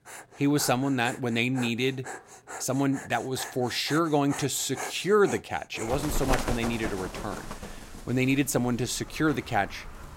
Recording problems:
animal sounds; noticeable; throughout; 10 dB below the speech

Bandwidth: 16 kHz